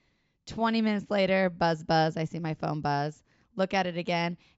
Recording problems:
high frequencies cut off; noticeable; nothing above 8 kHz

